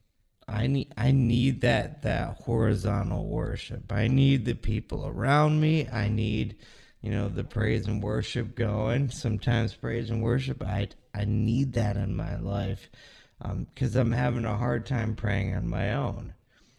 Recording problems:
wrong speed, natural pitch; too slow; 0.6 times normal speed

